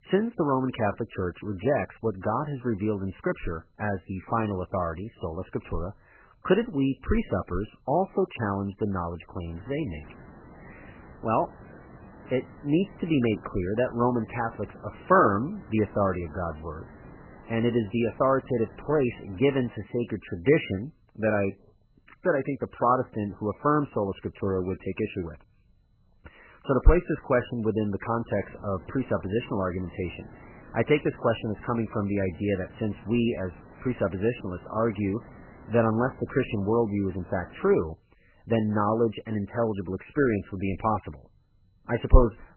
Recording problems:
garbled, watery; badly; nothing above 3 kHz
hiss; faint; from 9.5 to 20 s and from 28 to 38 s; 20 dB below the speech

